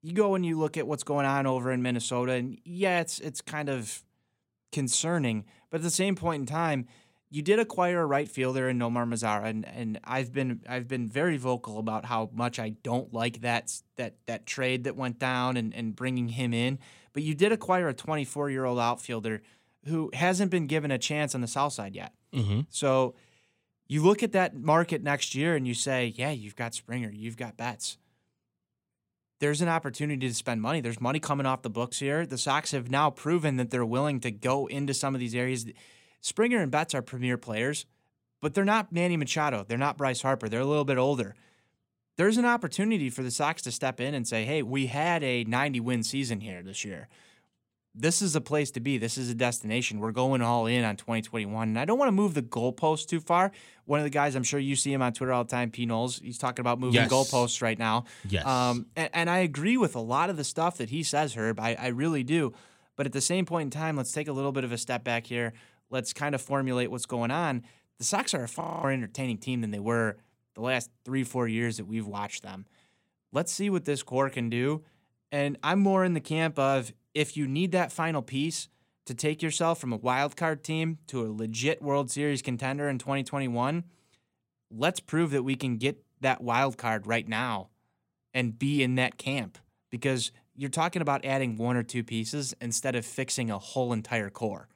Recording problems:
audio freezing; at 1:09

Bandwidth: 16 kHz